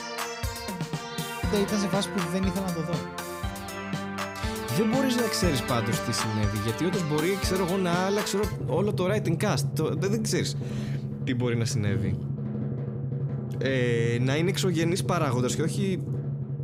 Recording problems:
background music; loud; throughout; 4 dB below the speech

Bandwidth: 15.5 kHz